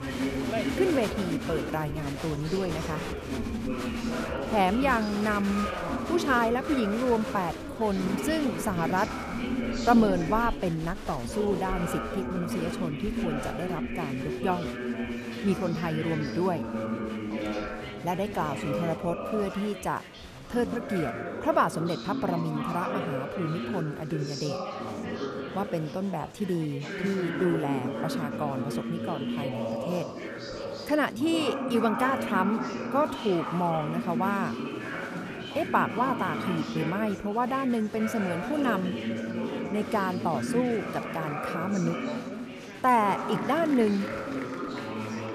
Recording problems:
chatter from many people; loud; throughout; 4 dB below the speech

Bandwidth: 14.5 kHz